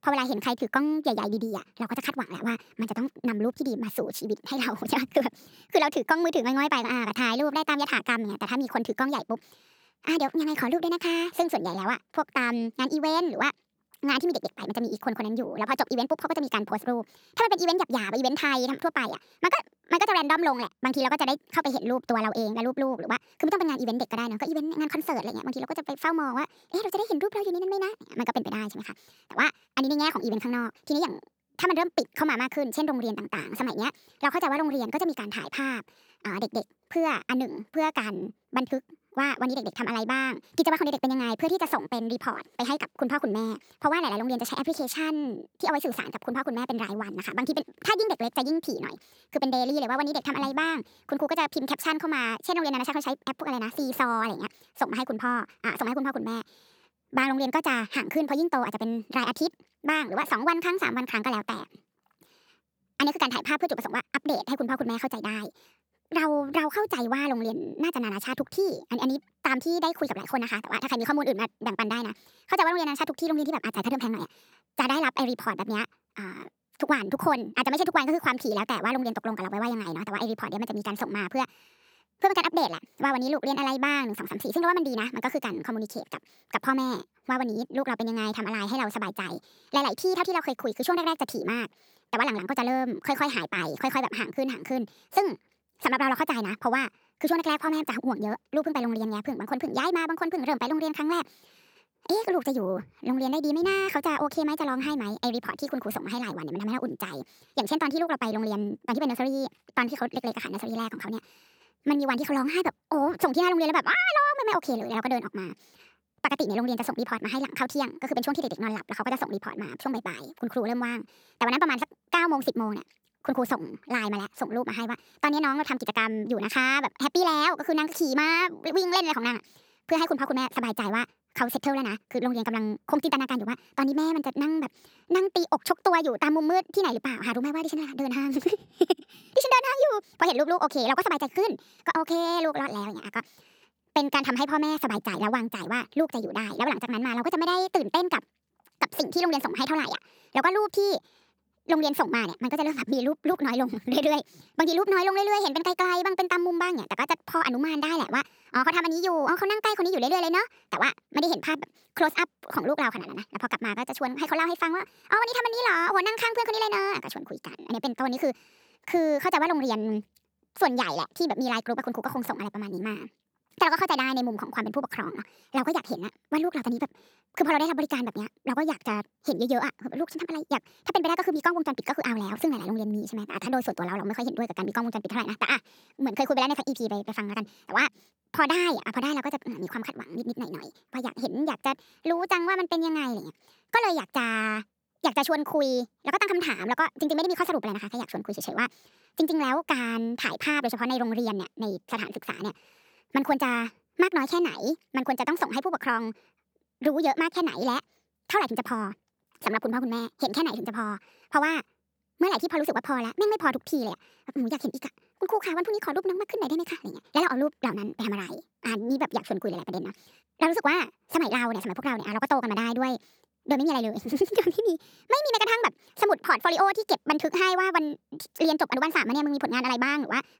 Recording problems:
wrong speed and pitch; too fast and too high; 1.5 times normal speed

